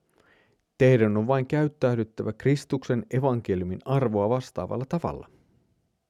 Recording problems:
none

